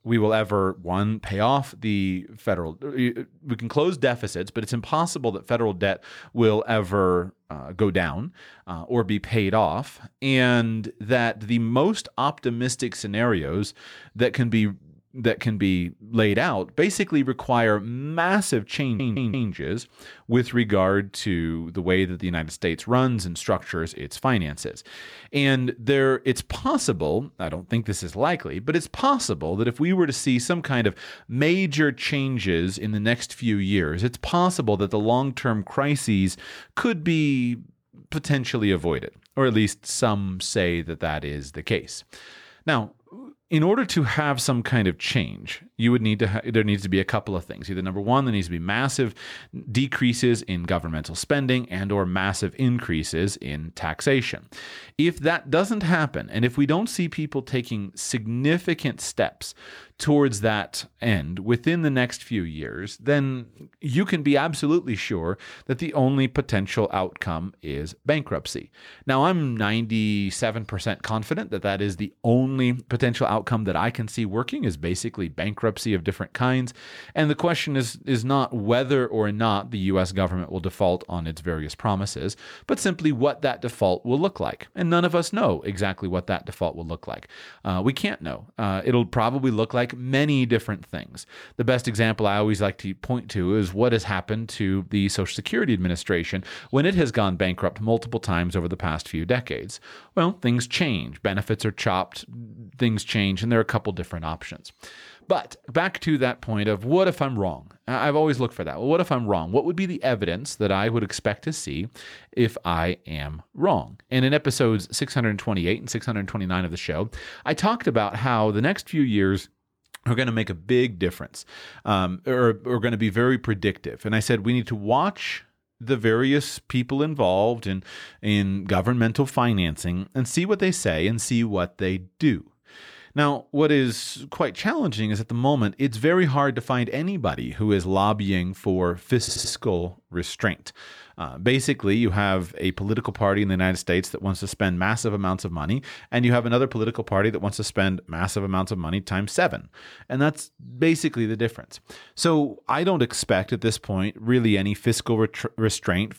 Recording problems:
audio stuttering; at 19 s and at 2:19

